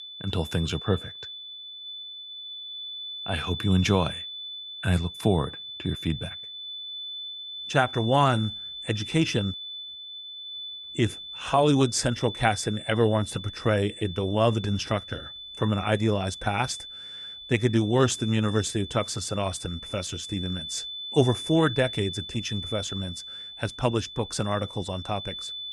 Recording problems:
high-pitched whine; loud; throughout; 3.5 kHz, 9 dB below the speech

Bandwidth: 13 kHz